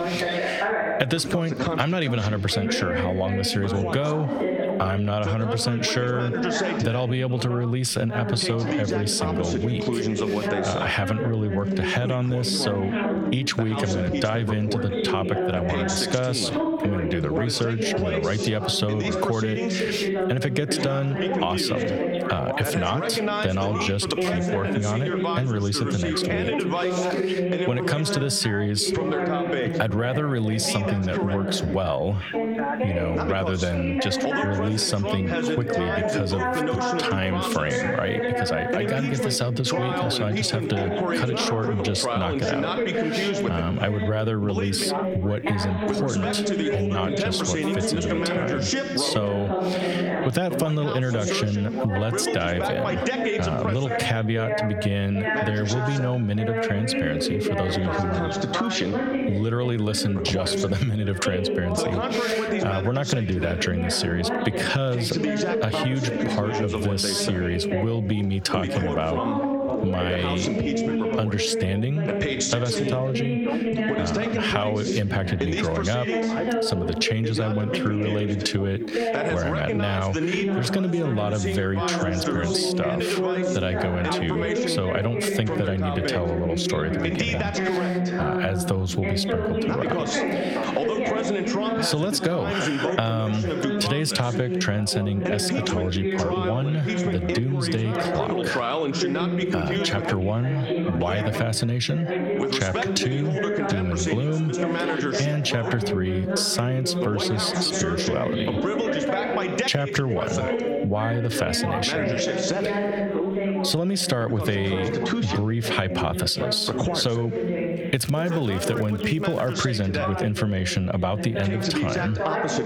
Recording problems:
squashed, flat; heavily
background chatter; loud; throughout; 3 voices, 1 dB below the speech
crackling; faint; from 1:58 to 2:00; 25 dB below the speech

